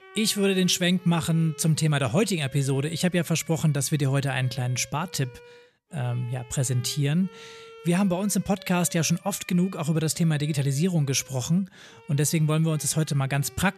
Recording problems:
background music; faint; throughout; 25 dB below the speech

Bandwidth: 14 kHz